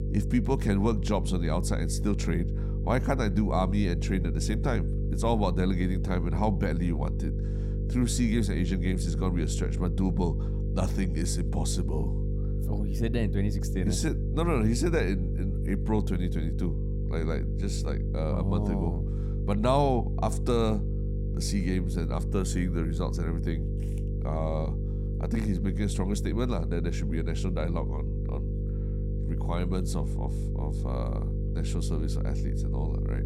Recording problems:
electrical hum; loud; throughout; 50 Hz, 9 dB below the speech

